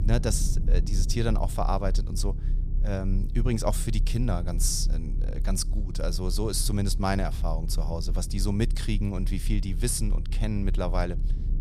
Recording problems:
low rumble; noticeable; throughout; 15 dB below the speech

